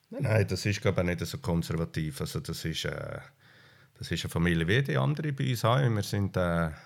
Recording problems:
none

